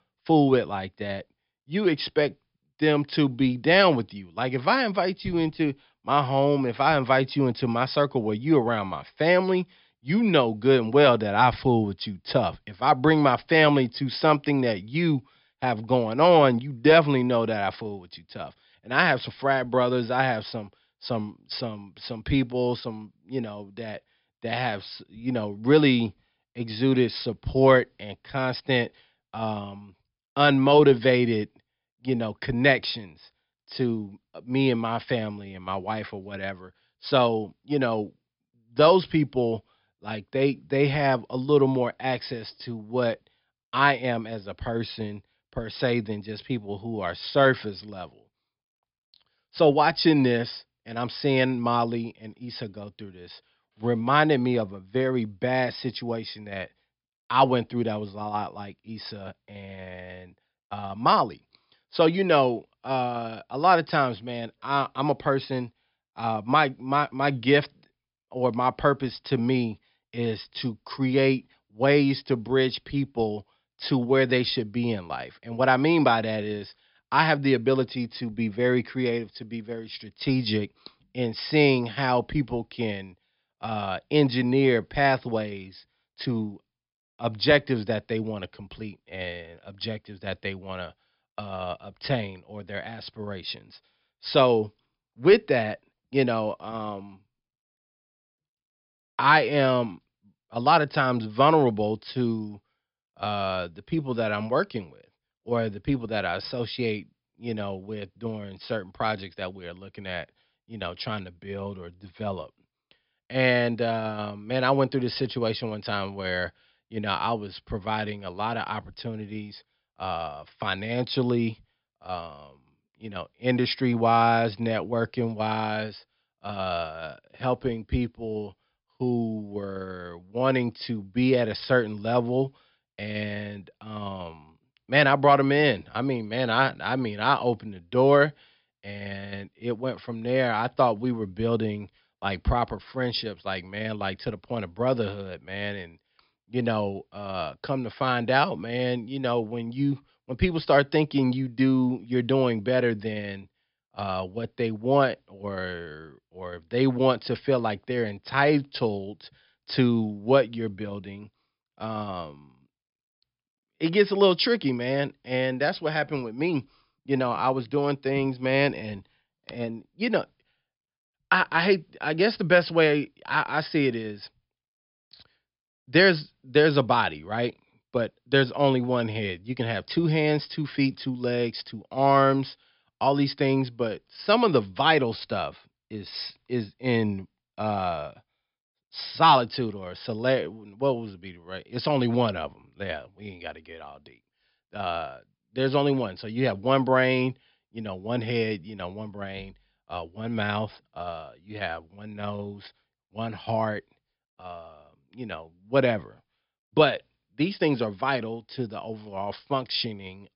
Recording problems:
high frequencies cut off; noticeable; nothing above 5.5 kHz

